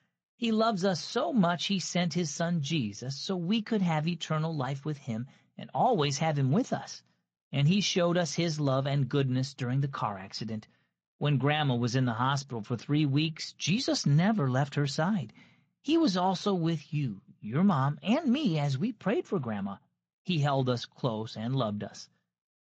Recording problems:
garbled, watery; slightly

